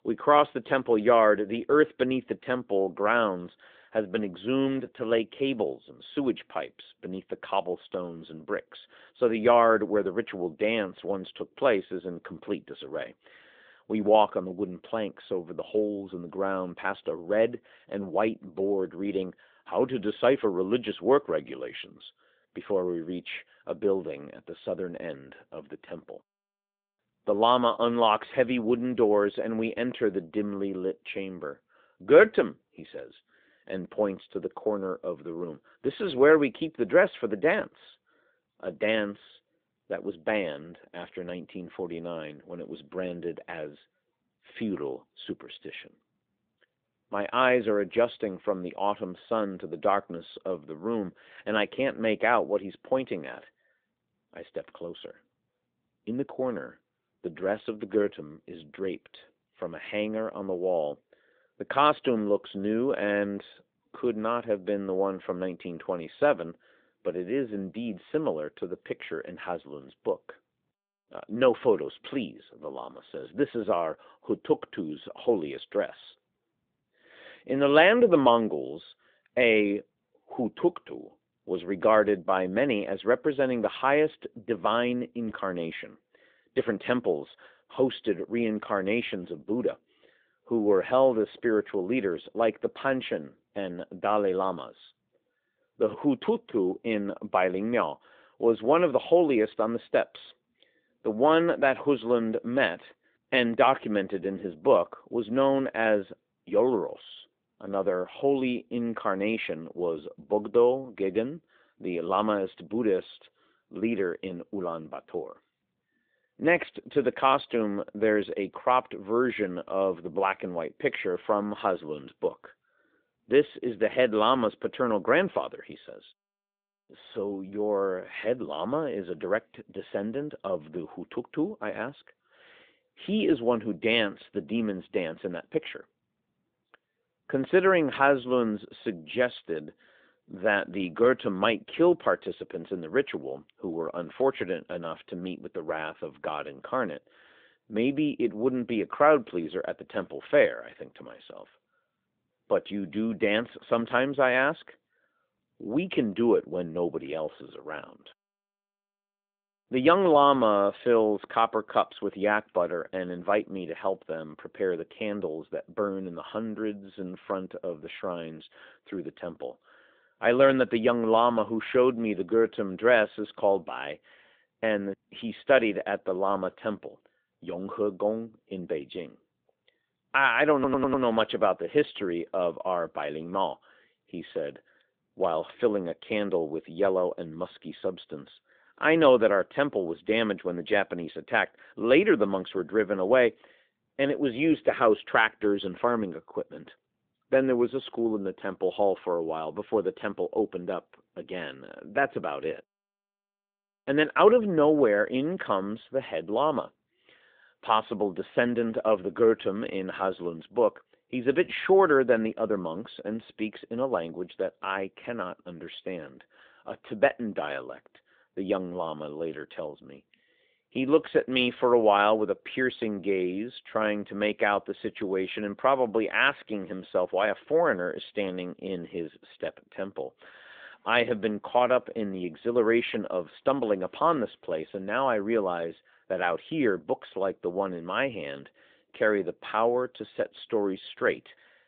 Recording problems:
phone-call audio
audio stuttering; at 3:01

